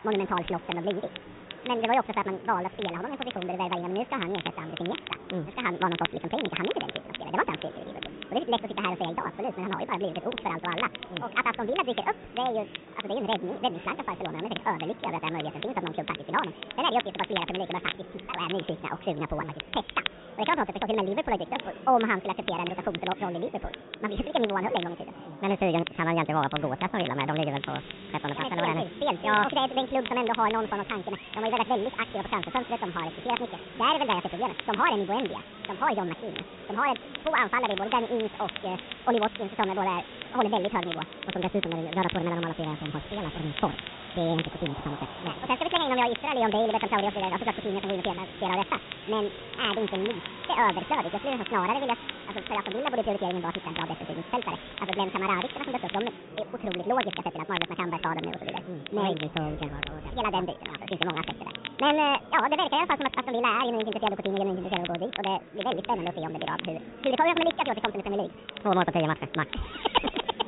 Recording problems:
high frequencies cut off; severe; nothing above 4 kHz
wrong speed and pitch; too fast and too high; 1.7 times normal speed
crackle, like an old record; loud; 10 dB below the speech
murmuring crowd; noticeable; throughout; 15 dB below the speech
hiss; noticeable; from 28 to 56 s; 15 dB below the speech

